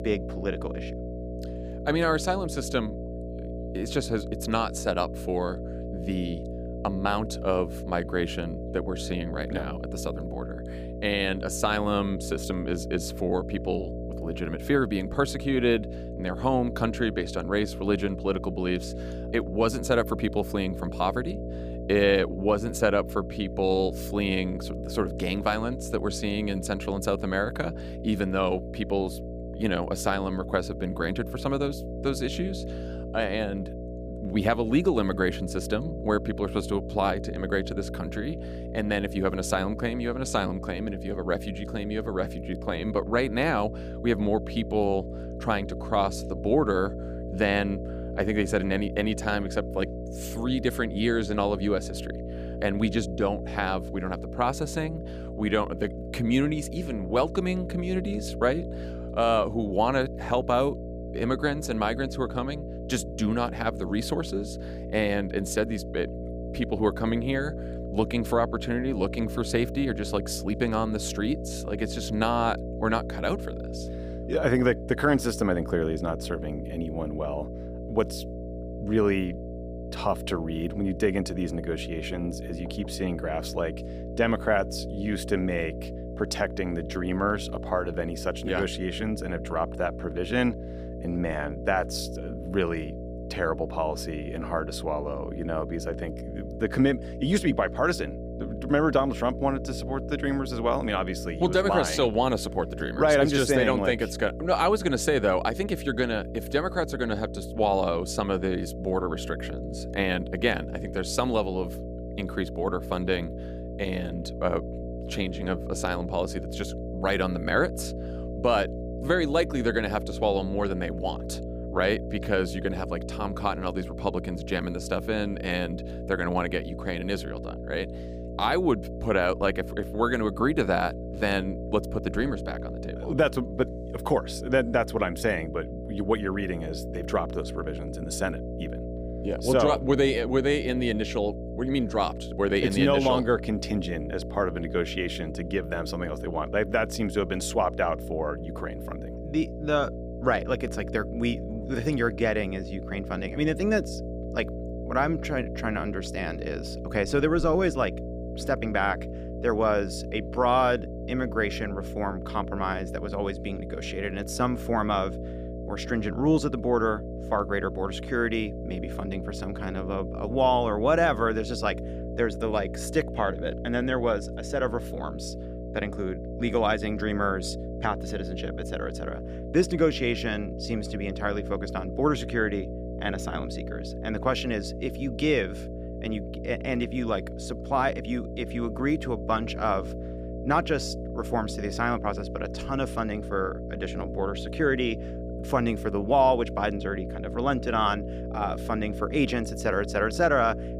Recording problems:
electrical hum; noticeable; throughout; 60 Hz, 10 dB below the speech

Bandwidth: 15 kHz